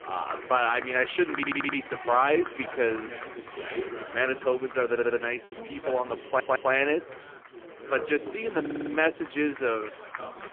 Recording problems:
phone-call audio; poor line
animal sounds; noticeable; throughout; 15 dB below the speech
chatter from many people; noticeable; throughout; 10 dB below the speech
audio stuttering; 4 times, first at 1.5 s
choppy; occasionally; at 5.5 s; 1% of the speech affected

